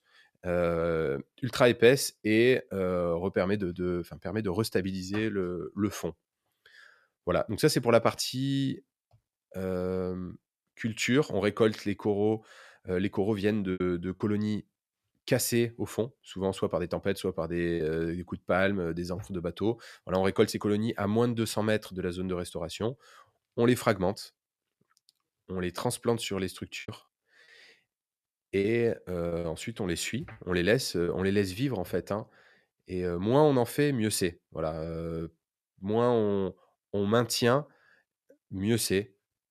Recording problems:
choppy; very; at 14 s, at 18 s and from 27 to 31 s; 8% of the speech affected

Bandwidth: 14 kHz